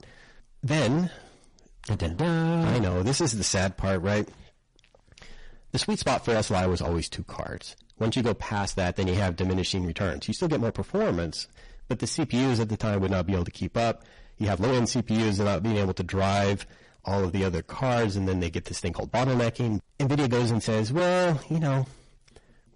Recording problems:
distortion; heavy; 18% of the sound clipped
garbled, watery; slightly; nothing above 10.5 kHz
uneven, jittery; strongly; from 0.5 to 22 s

